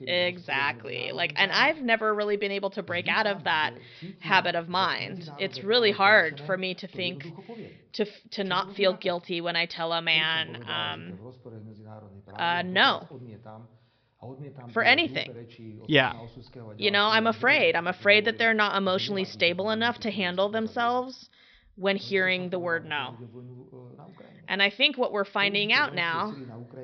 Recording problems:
high frequencies cut off; noticeable; nothing above 5.5 kHz
voice in the background; noticeable; throughout; 20 dB below the speech

